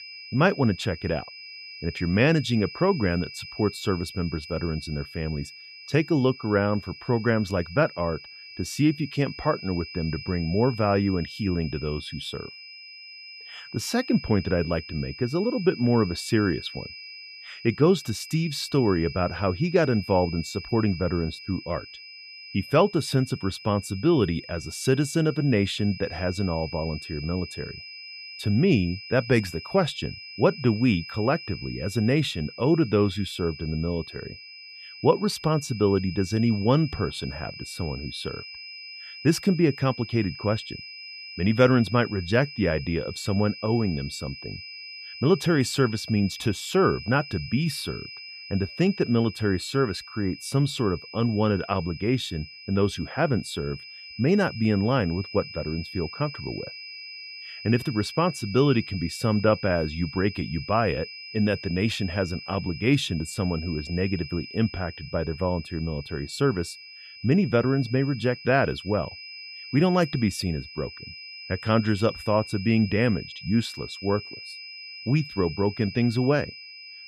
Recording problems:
high-pitched whine; noticeable; throughout; 5 kHz, 15 dB below the speech

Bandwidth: 14.5 kHz